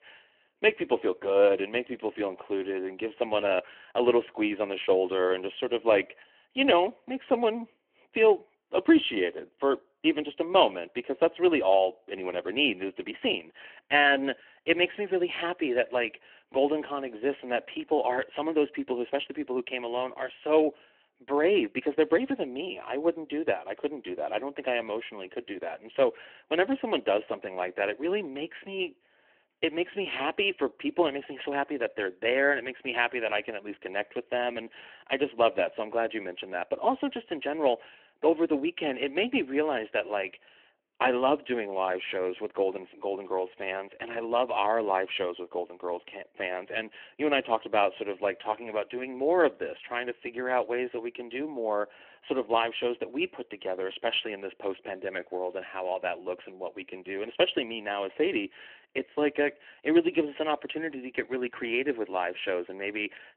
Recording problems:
phone-call audio

